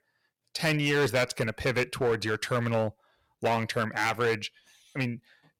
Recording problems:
distortion; heavy; 7% of the sound clipped

